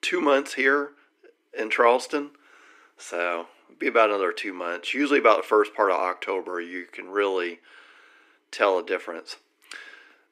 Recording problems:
thin; somewhat; fading below 300 Hz

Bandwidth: 15.5 kHz